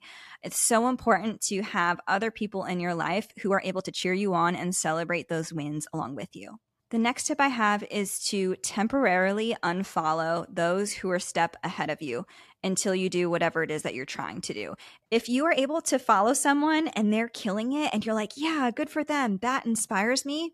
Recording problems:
uneven, jittery; strongly; from 3.5 to 16 s

